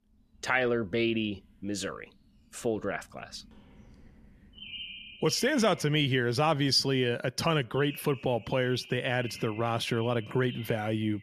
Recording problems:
animal sounds; noticeable; throughout; 15 dB below the speech

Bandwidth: 14.5 kHz